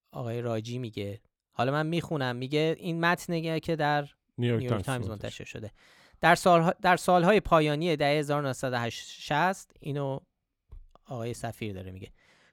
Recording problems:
none

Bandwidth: 17.5 kHz